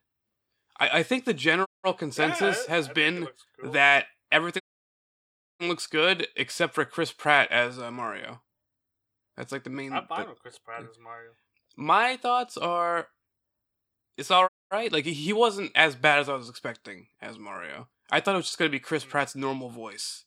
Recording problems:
audio cutting out; at 1.5 s, at 4.5 s for 1 s and at 14 s

